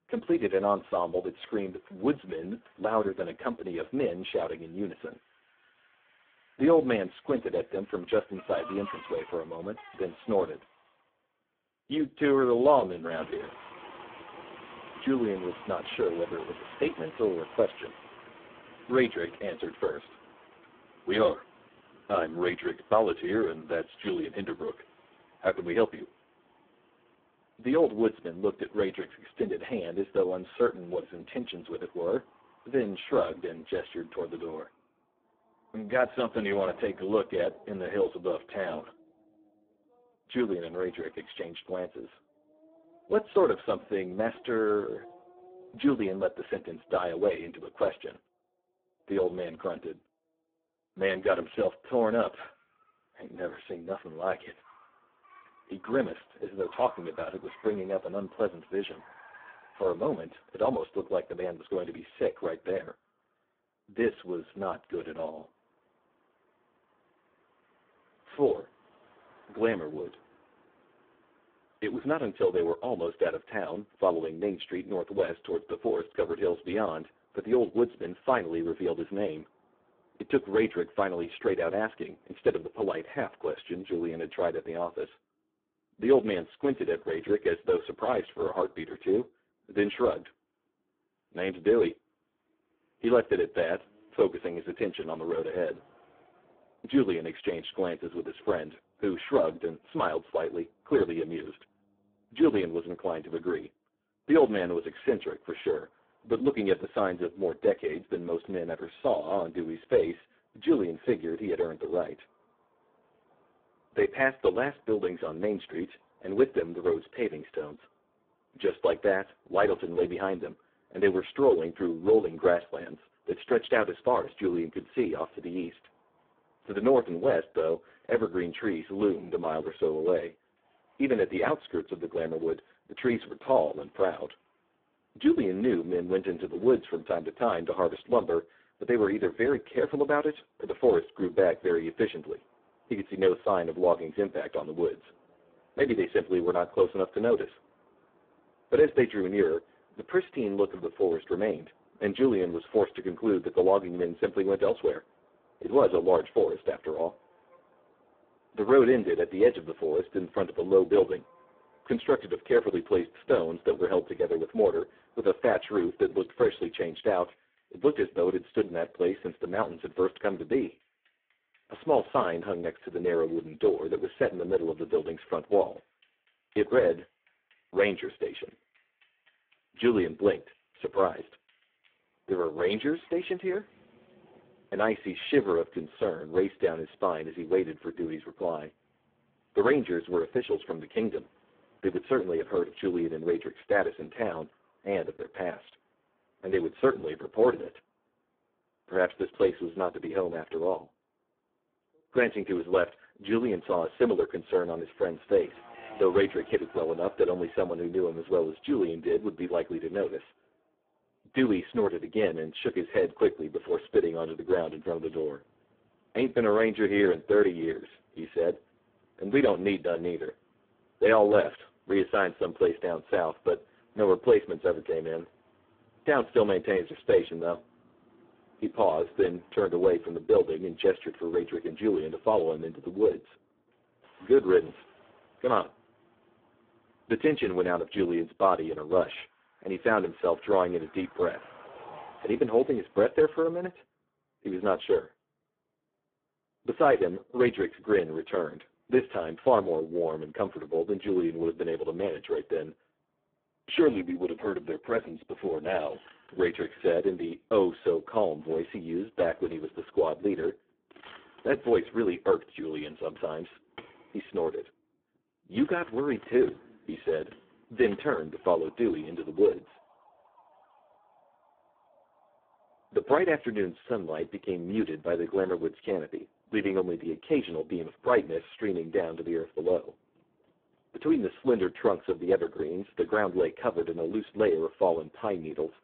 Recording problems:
phone-call audio; poor line
traffic noise; faint; throughout; 25 dB below the speech

